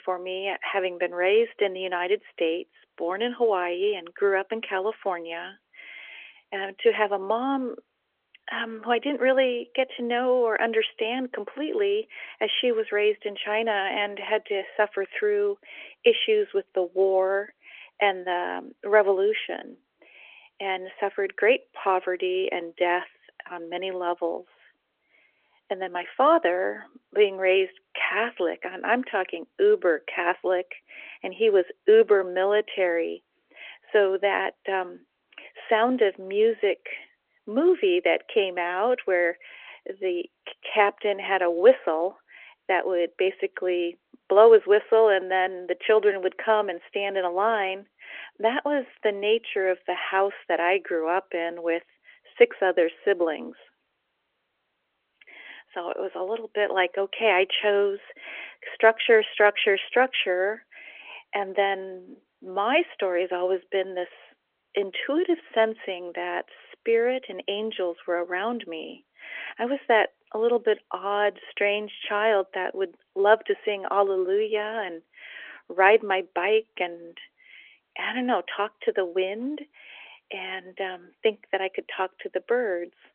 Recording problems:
phone-call audio; nothing above 3.5 kHz

